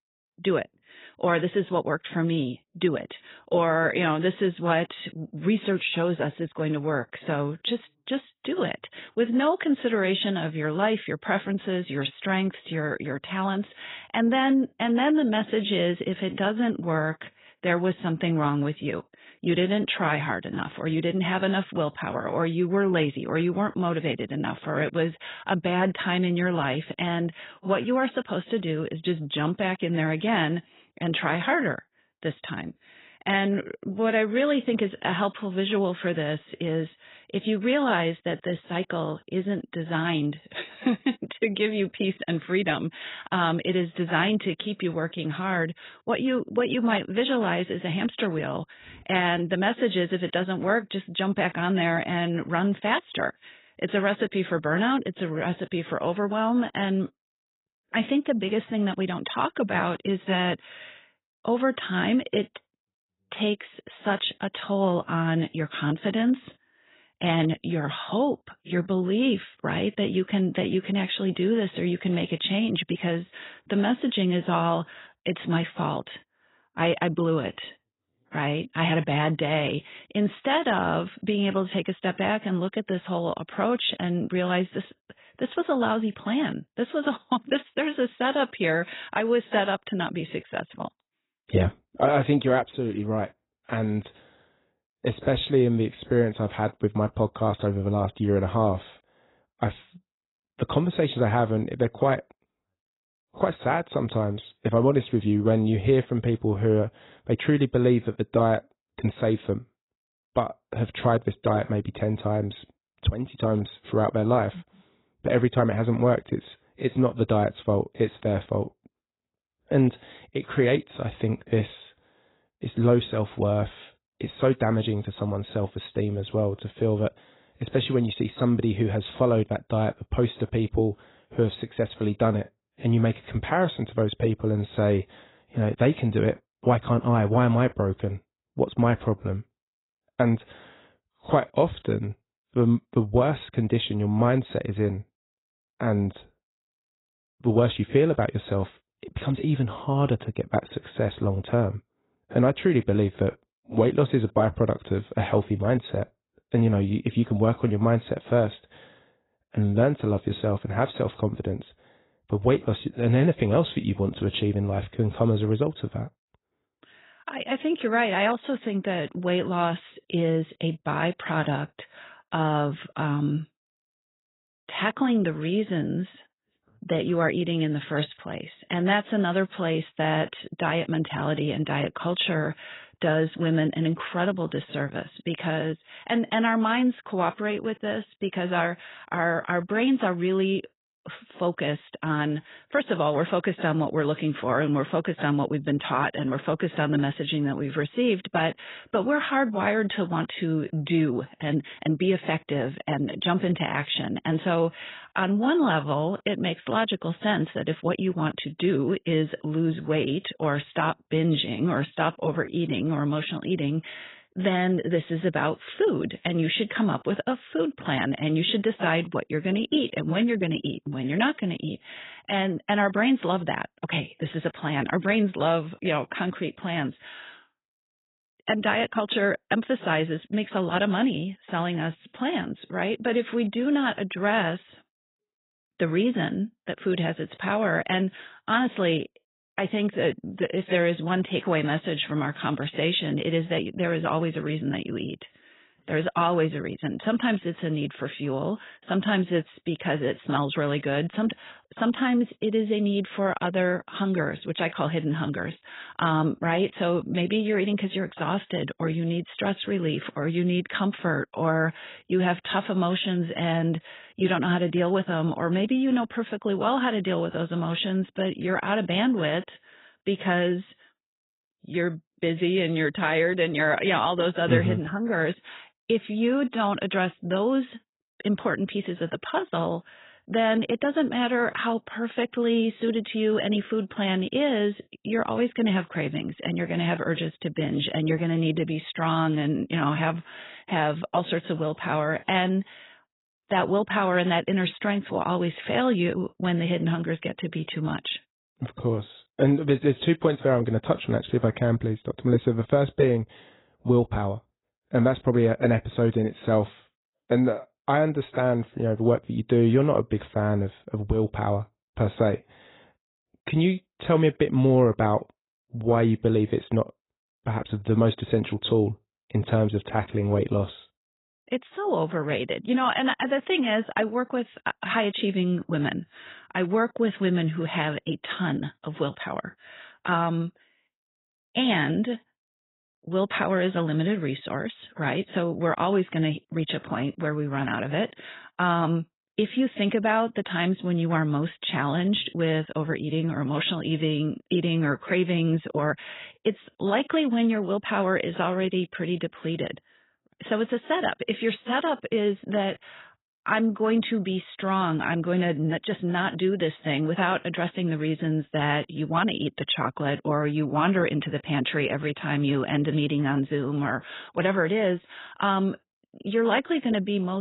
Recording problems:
garbled, watery; badly; nothing above 4 kHz
abrupt cut into speech; at the end

